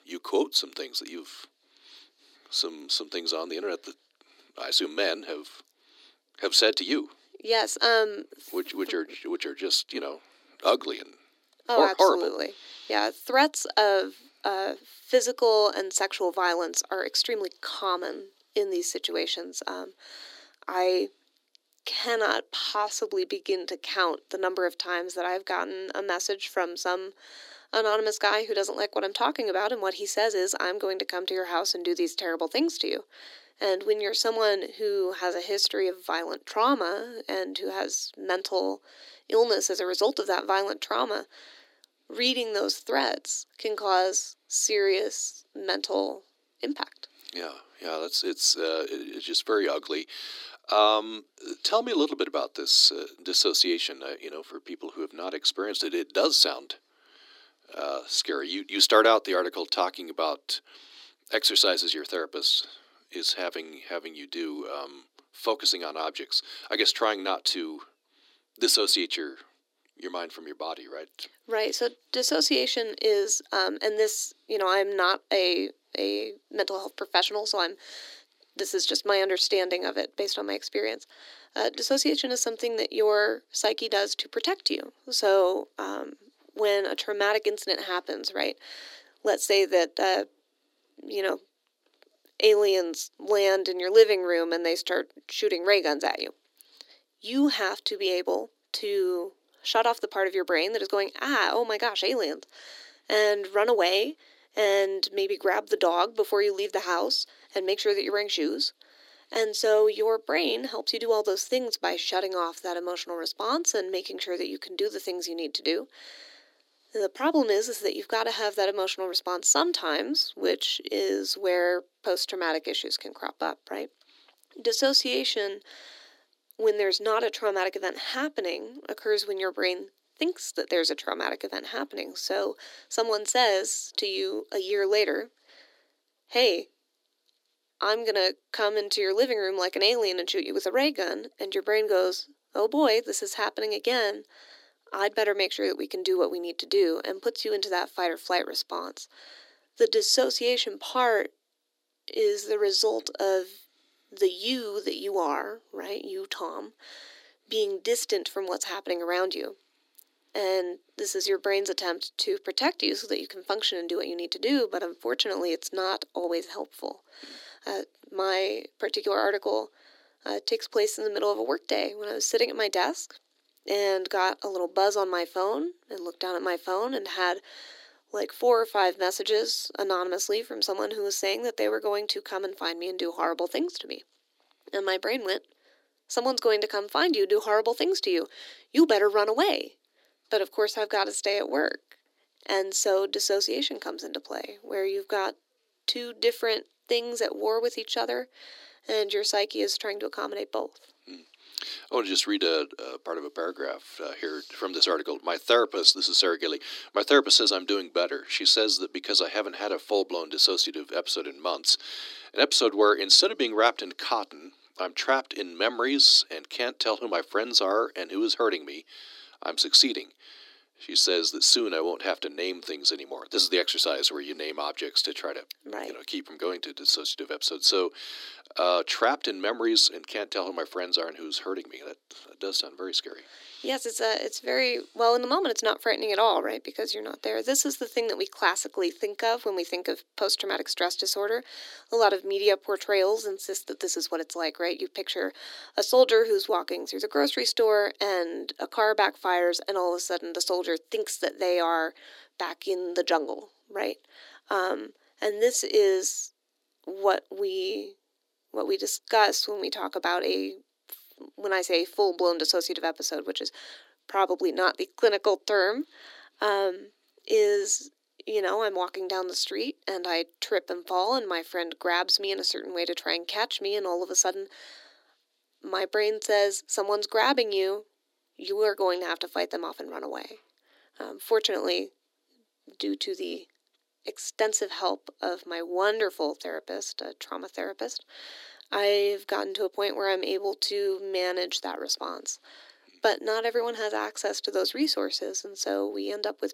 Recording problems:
thin; somewhat; fading below 300 Hz

